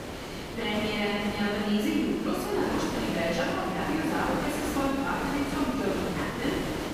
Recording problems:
room echo; strong; dies away in 1.7 s
off-mic speech; far
hiss; loud; throughout; 5 dB below the speech

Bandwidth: 15 kHz